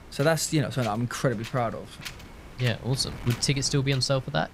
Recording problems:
wind noise on the microphone; occasional gusts; 15 dB below the speech

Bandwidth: 15.5 kHz